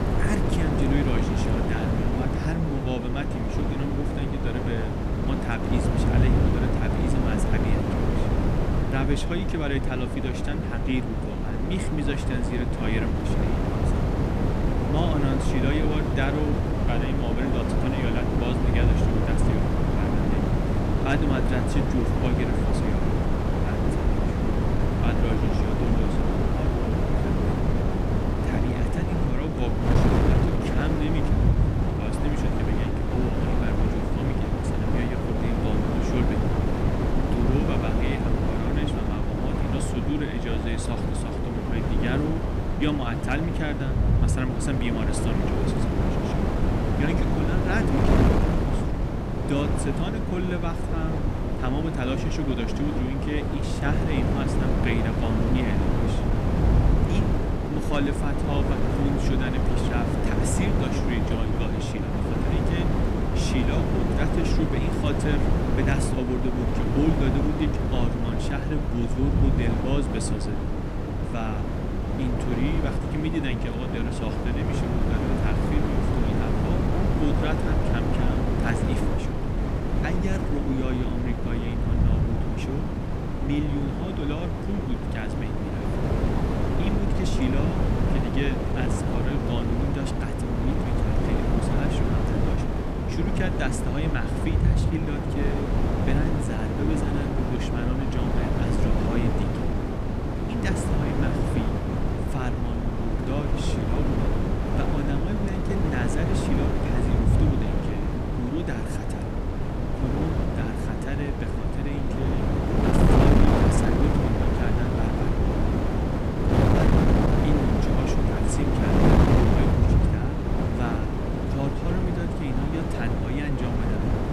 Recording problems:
echo of what is said; faint; throughout; 130 ms later, 25 dB below the speech
wind noise on the microphone; heavy; 3 dB above the speech
low rumble; noticeable; throughout; 15 dB below the speech

